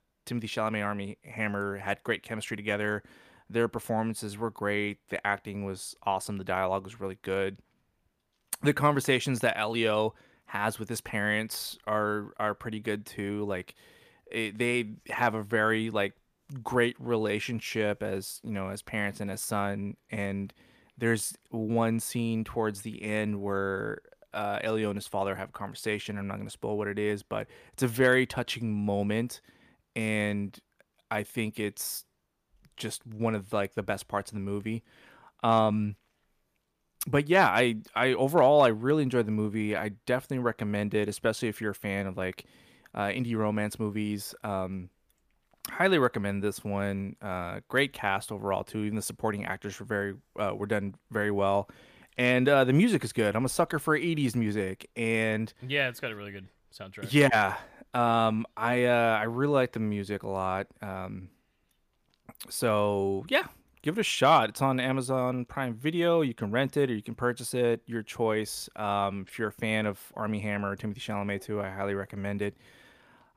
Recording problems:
none

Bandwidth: 15 kHz